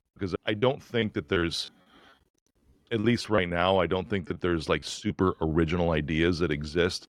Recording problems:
choppy; very; from 0.5 to 3.5 s and at 4.5 s; 10% of the speech affected

